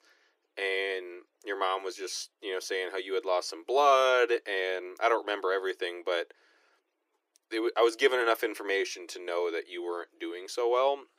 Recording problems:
thin; very; fading below 300 Hz

